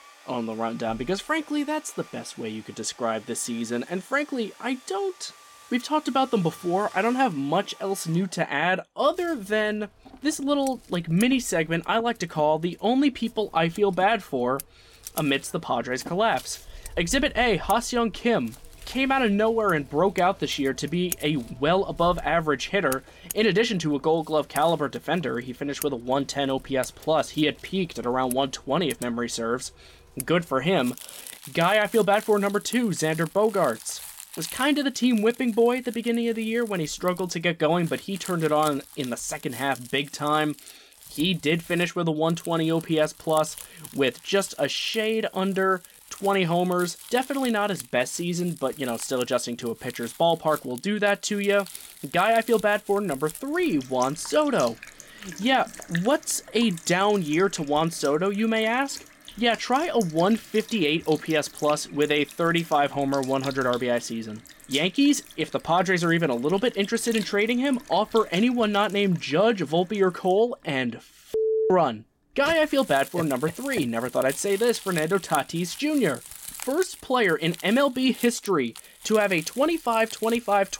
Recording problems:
household noises; noticeable; throughout; 15 dB below the speech

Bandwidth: 16.5 kHz